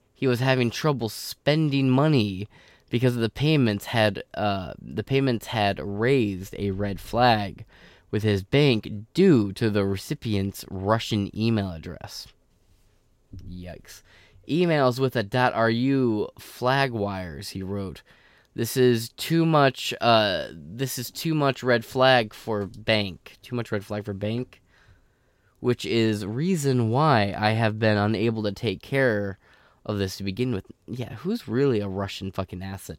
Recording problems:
none

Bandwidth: 16 kHz